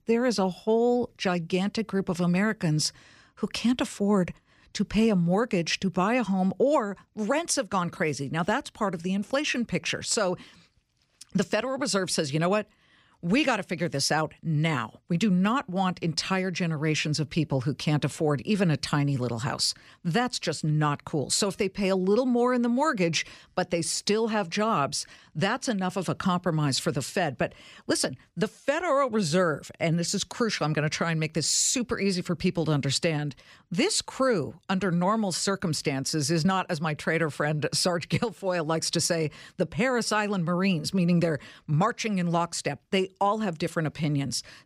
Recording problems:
none

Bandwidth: 15 kHz